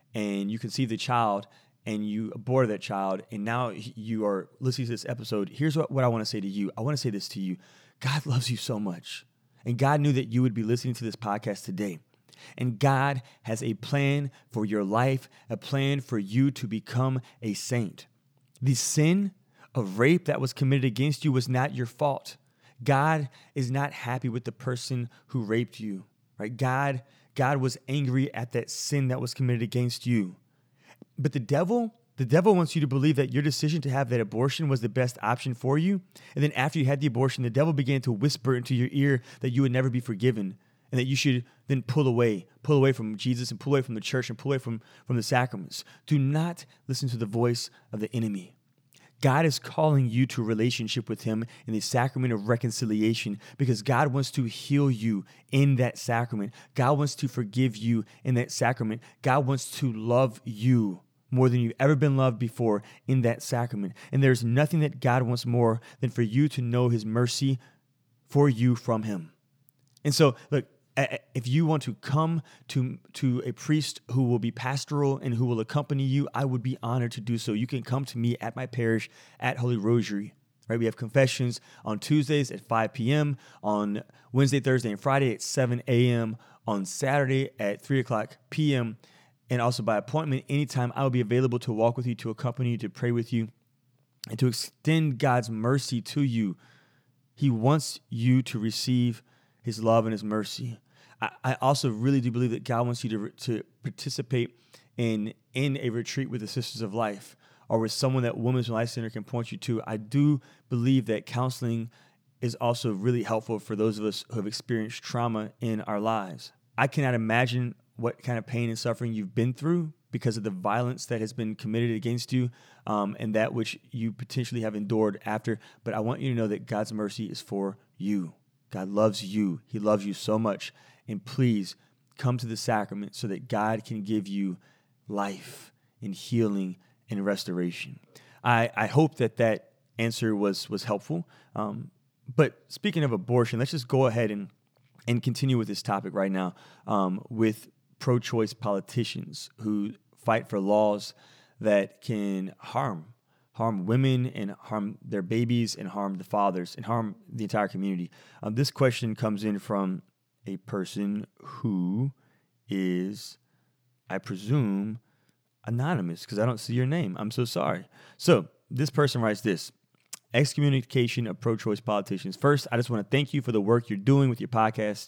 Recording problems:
none

